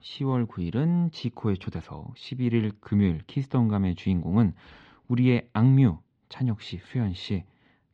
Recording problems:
muffled; slightly; fading above 4 kHz

